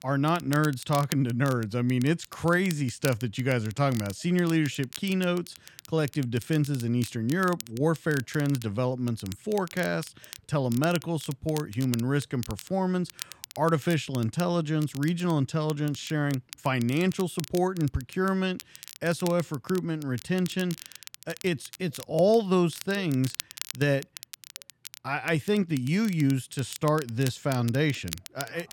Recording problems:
crackle, like an old record; noticeable; 15 dB below the speech

